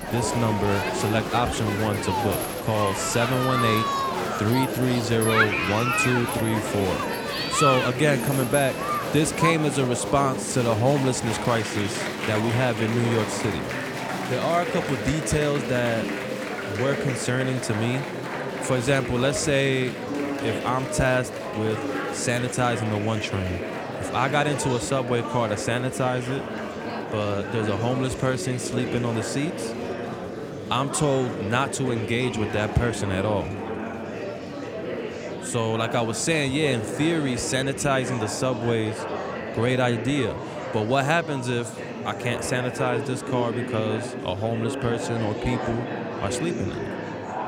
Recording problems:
murmuring crowd; loud; throughout; 4 dB below the speech

